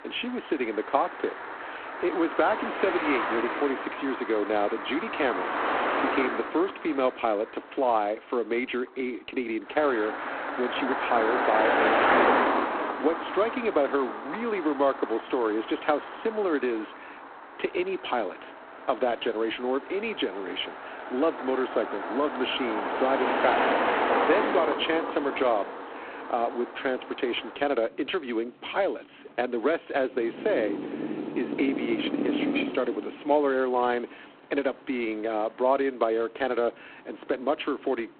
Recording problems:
phone-call audio; poor line
traffic noise; loud; throughout; 1 dB below the speech

